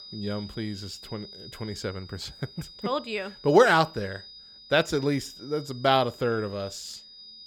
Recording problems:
high-pitched whine; noticeable; throughout; 5 kHz, 15 dB below the speech

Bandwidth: 18.5 kHz